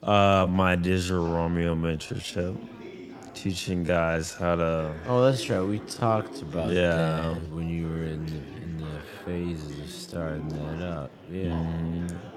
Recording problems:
wrong speed, natural pitch; too slow; 0.6 times normal speed
chatter from many people; noticeable; throughout; 15 dB below the speech

